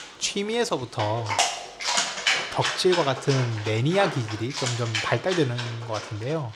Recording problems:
animal sounds; loud; throughout; 2 dB below the speech

